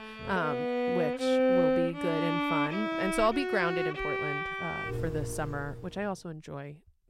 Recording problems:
background music; very loud; until 5.5 s; 3 dB above the speech

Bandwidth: 16 kHz